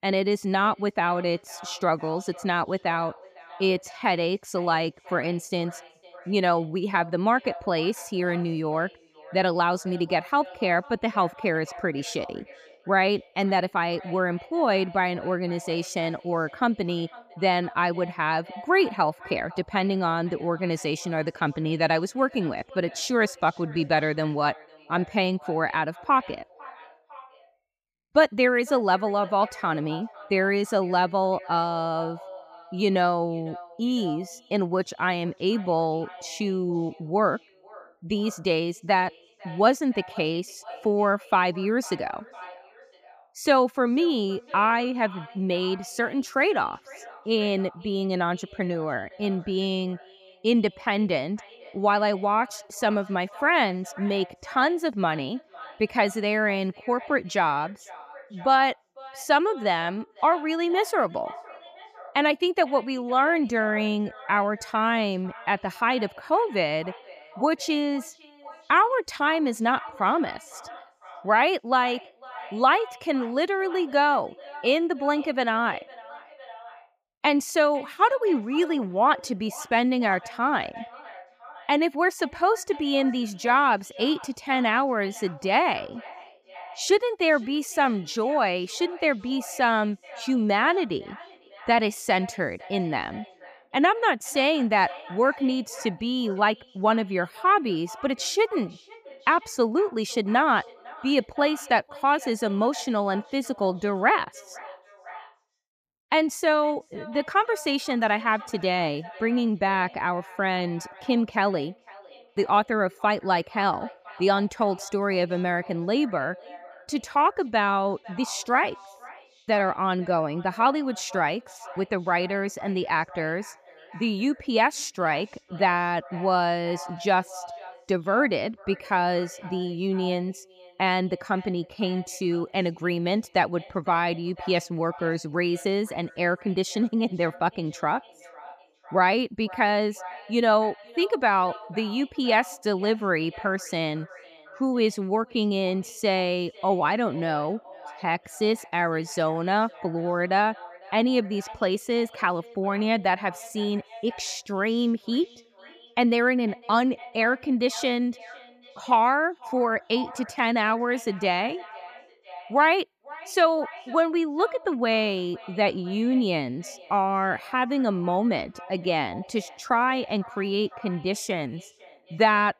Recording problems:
echo of what is said; faint; throughout; 500 ms later, 20 dB below the speech

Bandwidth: 15 kHz